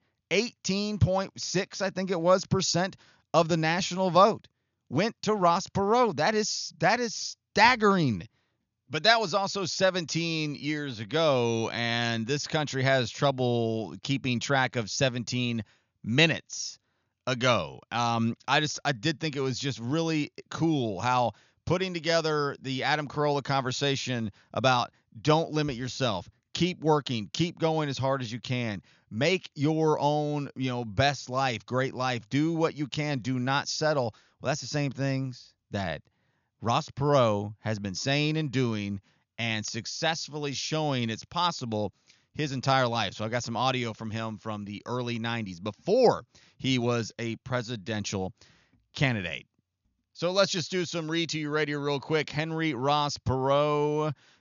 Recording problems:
high frequencies cut off; noticeable; nothing above 7 kHz

